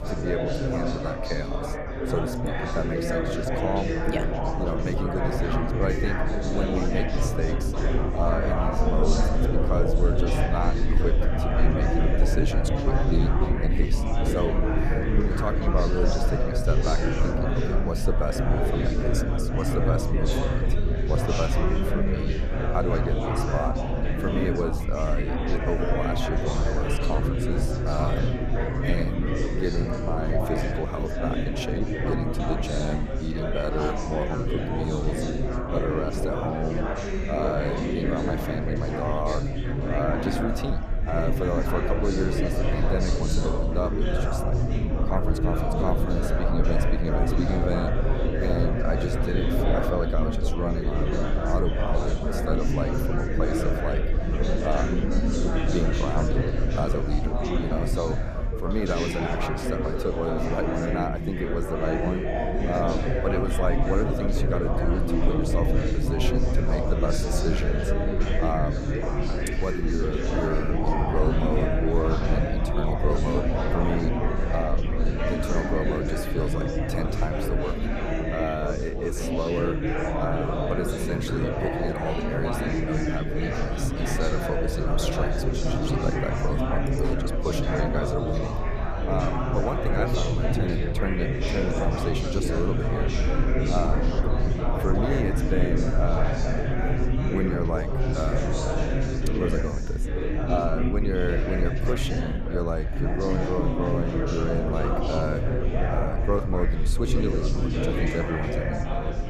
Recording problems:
chatter from many people; very loud; throughout; 2 dB above the speech
low rumble; noticeable; throughout; 15 dB below the speech

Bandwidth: 14.5 kHz